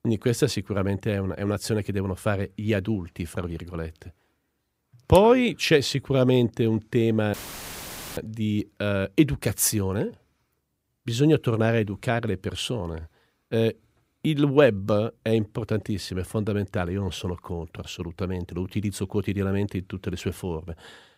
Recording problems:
audio cutting out; filled with static; at 7.5 s for 1 s

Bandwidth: 15.5 kHz